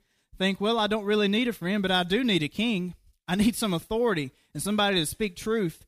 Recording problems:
none

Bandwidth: 15 kHz